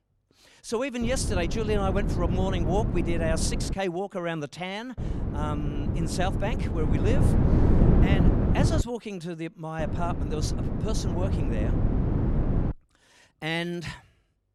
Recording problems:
wind noise on the microphone; heavy; from 1 to 3.5 s, from 5 to 9 s and from 10 to 13 s; 3 dB below the speech

